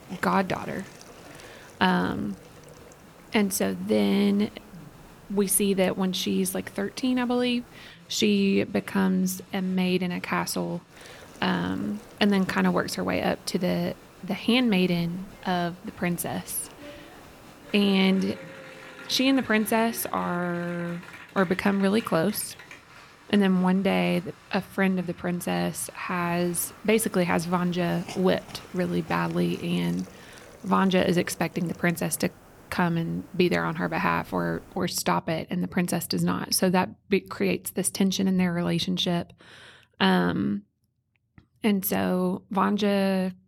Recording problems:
crowd noise; faint; until 30 s; 20 dB below the speech
hiss; faint; until 8 s, from 11 to 18 s and from 26 to 35 s; 25 dB below the speech

